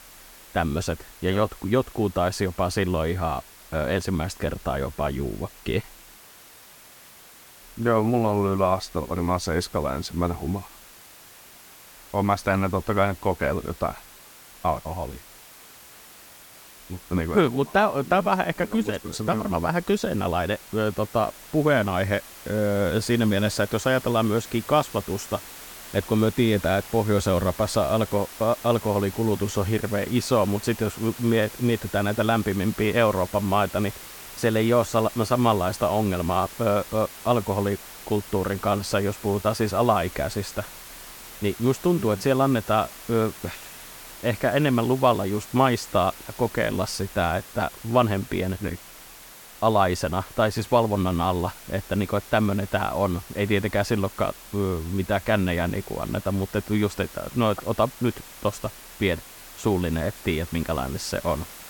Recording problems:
hiss; noticeable; throughout; 15 dB below the speech

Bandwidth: 17.5 kHz